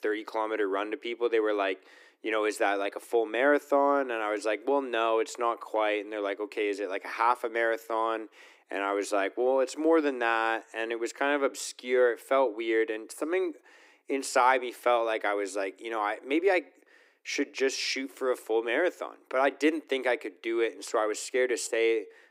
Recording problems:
thin; very; fading below 300 Hz

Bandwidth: 15.5 kHz